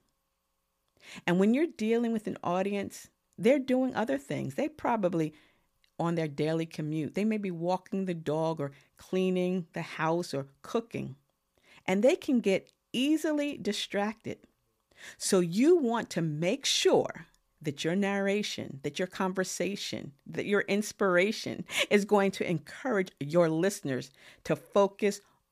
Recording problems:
none

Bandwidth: 15 kHz